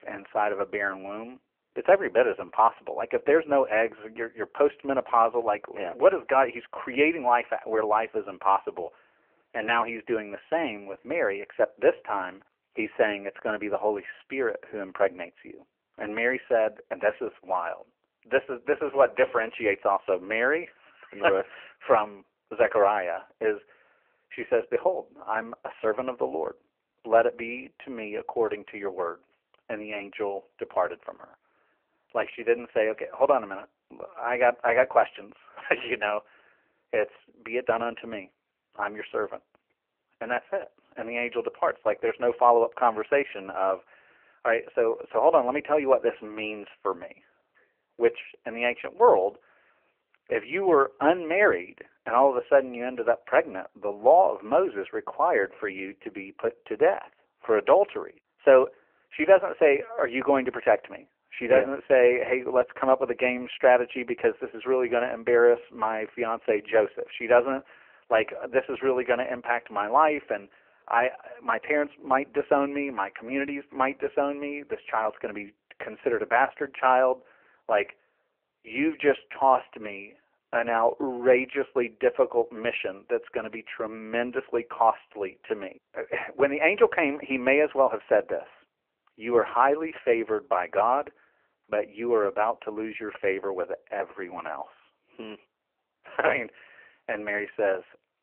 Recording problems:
phone-call audio; poor line; nothing above 3 kHz

